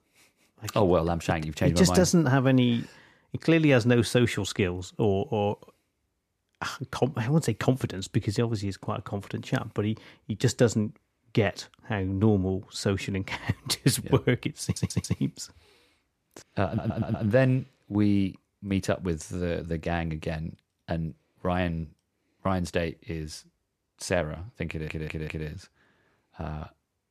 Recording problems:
audio stuttering; at 15 s, at 17 s and at 25 s

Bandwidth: 14.5 kHz